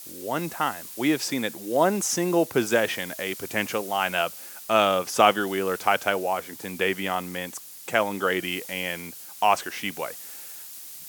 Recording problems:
hiss; noticeable; throughout; 15 dB below the speech

